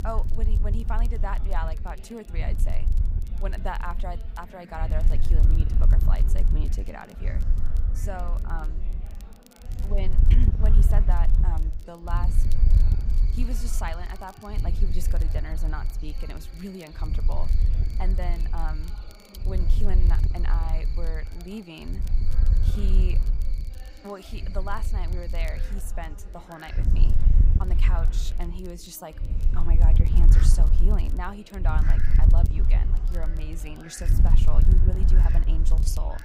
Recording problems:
wind noise on the microphone; heavy; 6 dB below the speech
animal sounds; noticeable; throughout; 15 dB below the speech
chatter from many people; noticeable; throughout; 15 dB below the speech
crackle, like an old record; noticeable; 20 dB below the speech

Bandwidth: 15.5 kHz